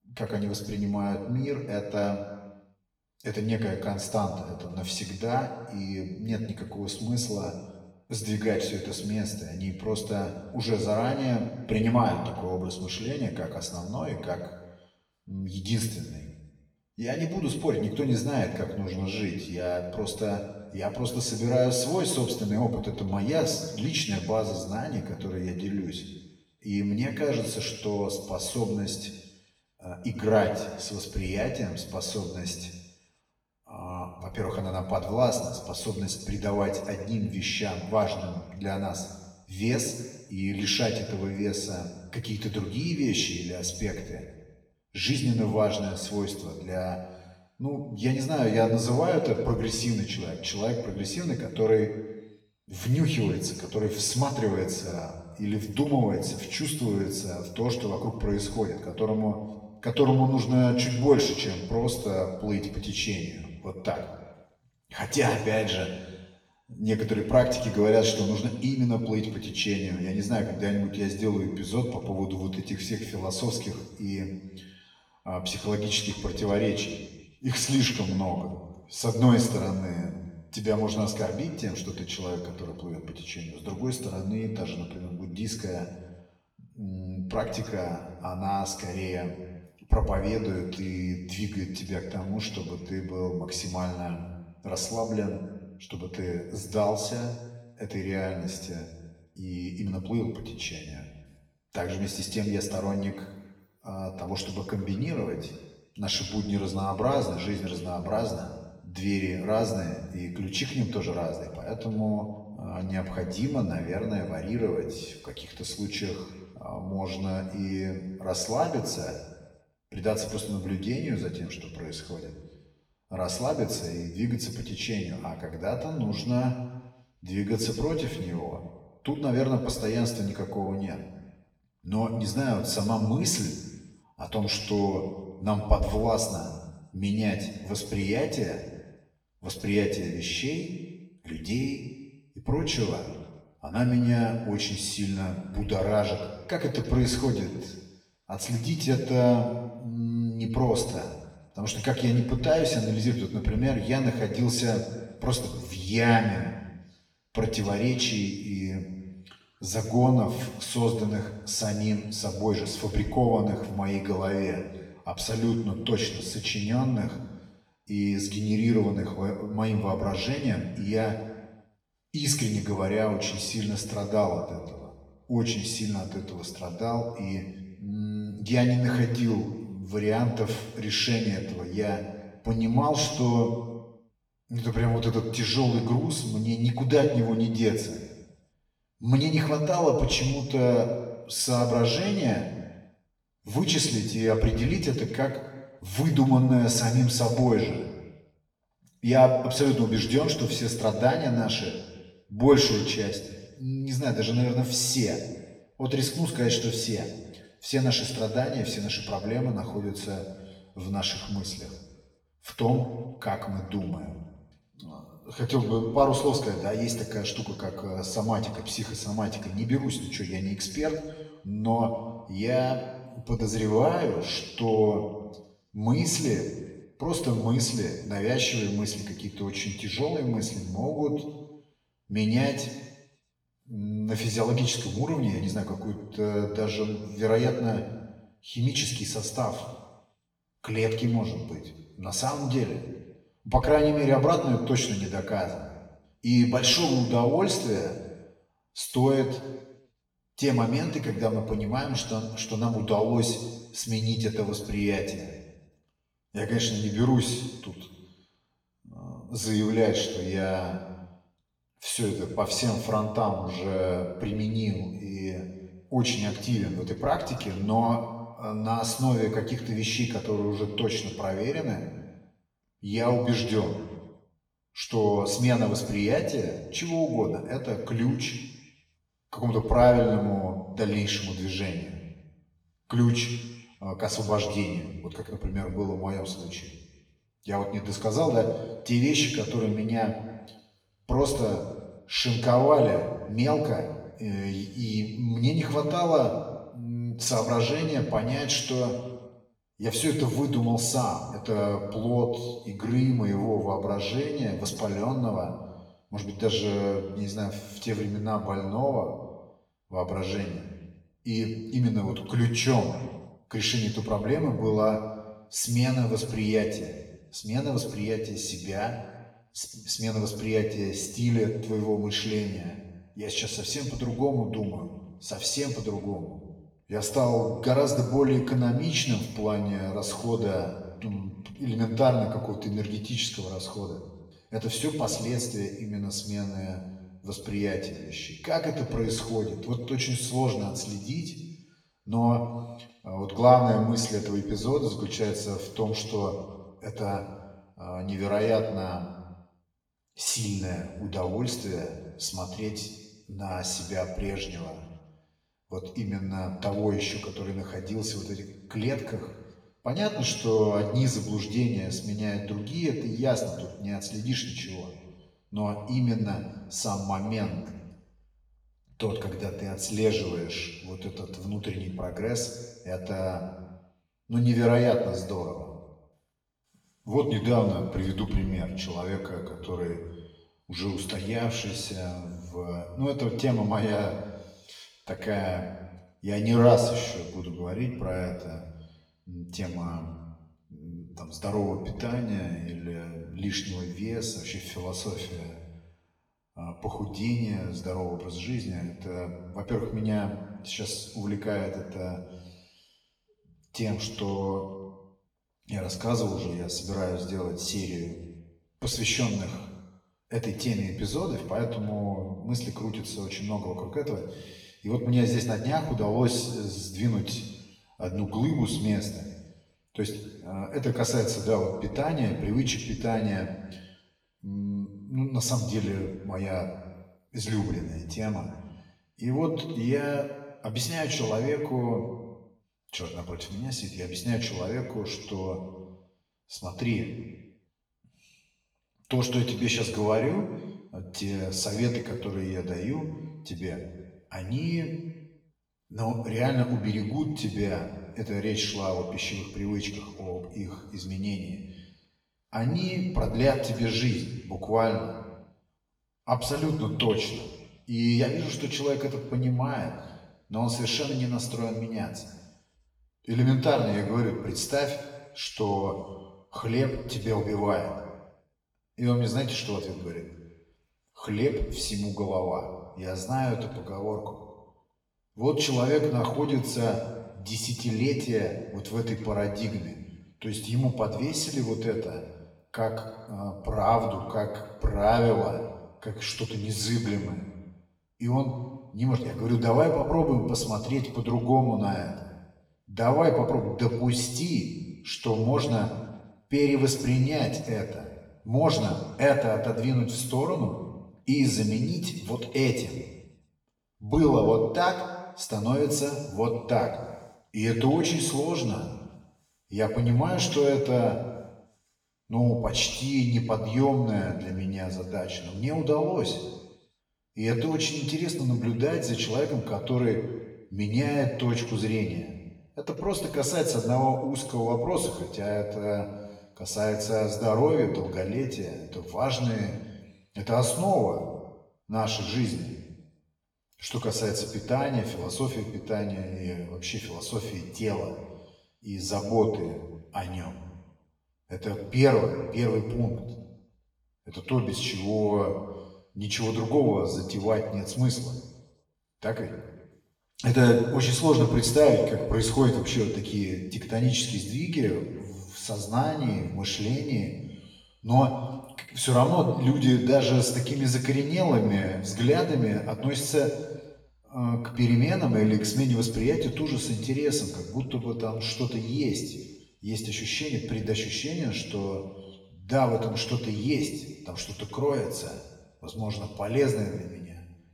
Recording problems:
off-mic speech; far
room echo; slight; dies away in 1.1 s

